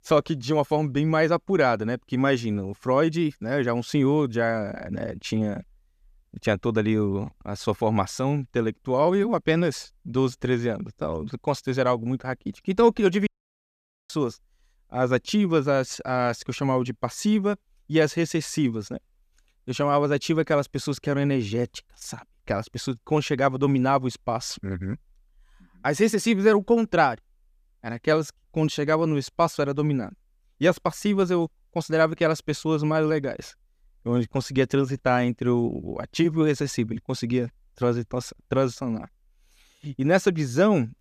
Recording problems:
audio cutting out; at 13 s for 1 s

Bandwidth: 14.5 kHz